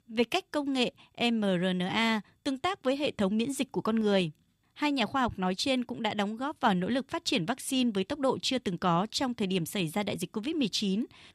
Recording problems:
none

